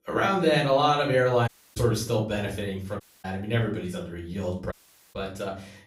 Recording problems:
off-mic speech; far
room echo; slight; dies away in 0.4 s
audio cutting out; at 1.5 s, at 3 s and at 4.5 s

